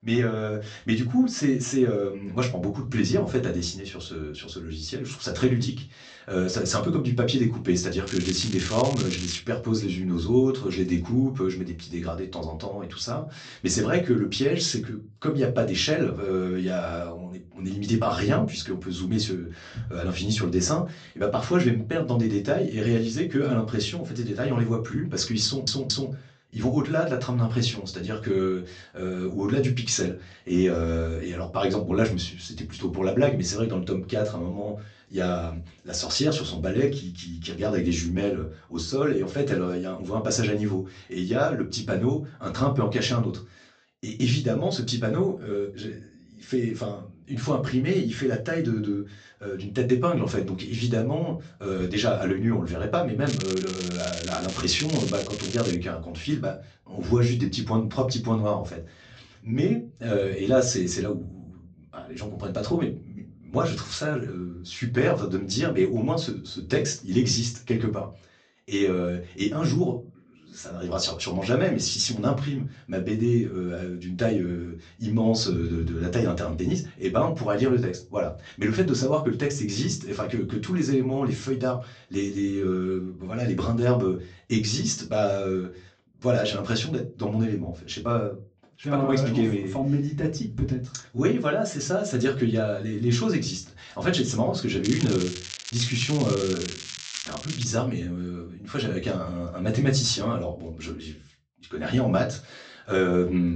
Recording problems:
off-mic speech; far
high frequencies cut off; noticeable; nothing above 8 kHz
room echo; very slight; dies away in 0.3 s
crackling; loud; from 8 to 9.5 s, from 53 to 56 s and from 1:35 to 1:38; 9 dB below the speech
audio stuttering; at 25 s
abrupt cut into speech; at the end

